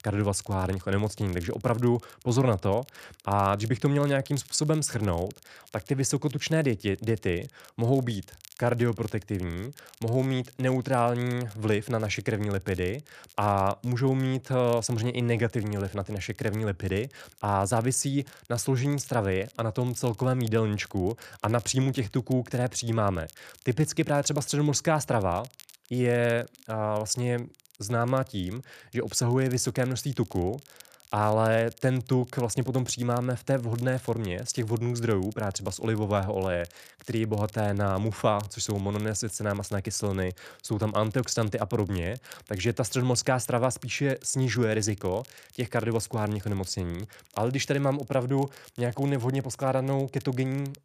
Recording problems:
crackle, like an old record; faint; 25 dB below the speech

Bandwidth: 14.5 kHz